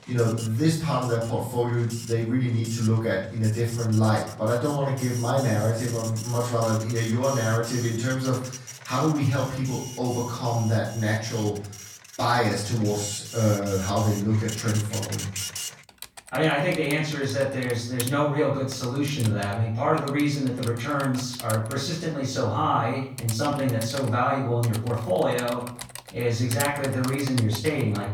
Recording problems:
off-mic speech; far
room echo; noticeable; dies away in 0.5 s
household noises; noticeable; throughout; 10 dB below the speech

